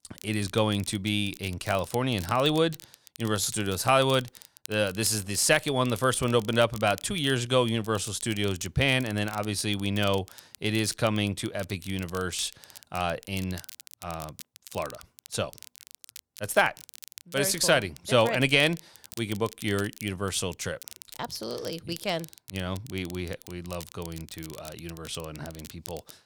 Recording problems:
crackle, like an old record; noticeable; 20 dB below the speech

